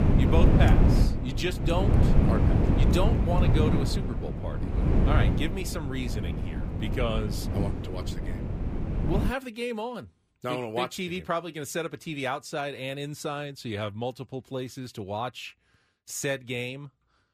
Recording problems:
wind noise on the microphone; heavy; until 9.5 s; 2 dB below the speech

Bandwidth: 15 kHz